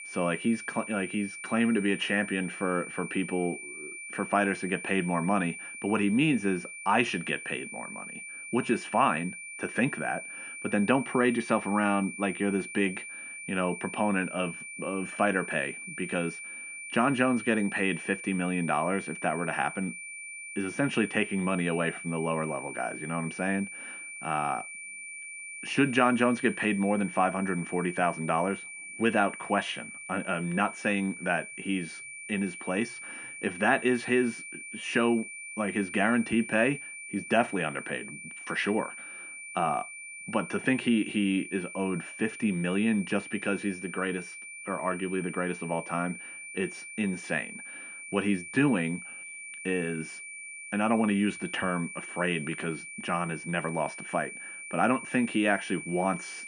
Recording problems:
muffled; very; fading above 2.5 kHz
high-pitched whine; noticeable; throughout; 2.5 kHz, 10 dB below the speech

